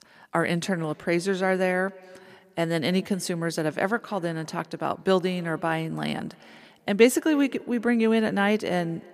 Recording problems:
echo of what is said; faint; throughout; 280 ms later, 25 dB below the speech

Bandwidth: 14.5 kHz